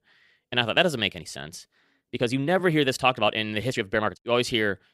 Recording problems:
uneven, jittery; strongly; from 0.5 to 4 s

